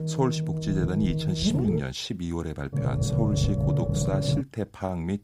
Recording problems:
low rumble; loud; until 2 s and from 2.5 to 4.5 s; 1 dB below the speech

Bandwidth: 15.5 kHz